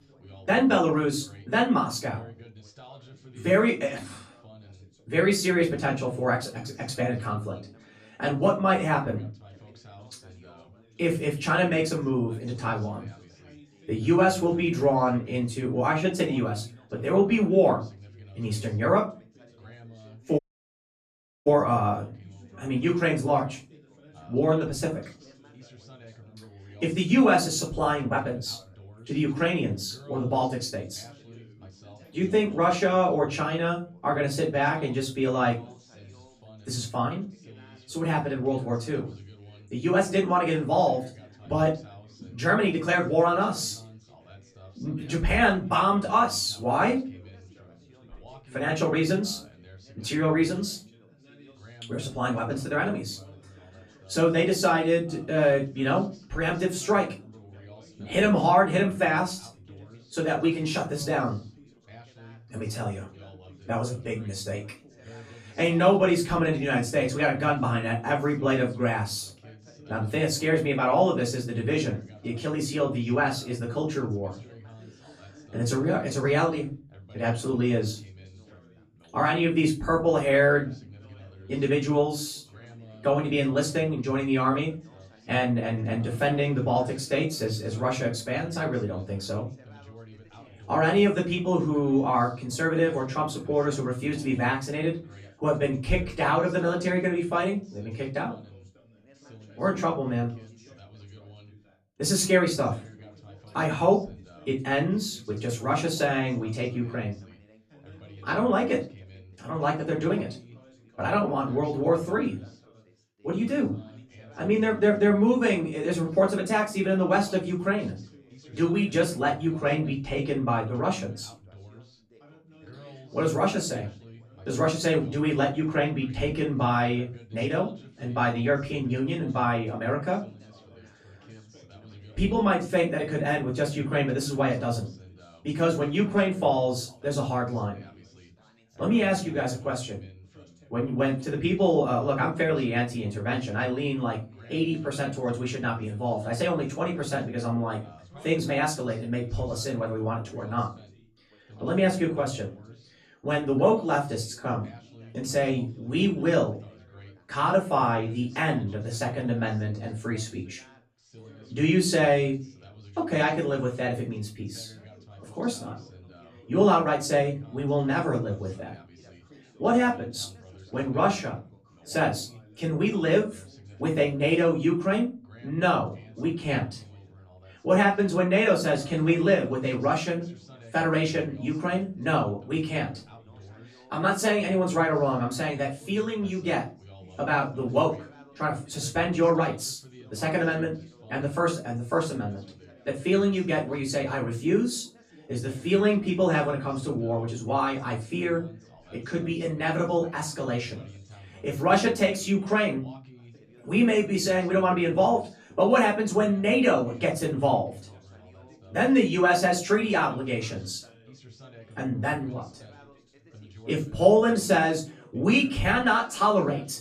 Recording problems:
off-mic speech; far
room echo; slight; dies away in 0.3 s
background chatter; faint; throughout; 3 voices, 25 dB below the speech
audio cutting out; at 20 s for 1 s

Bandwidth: 14 kHz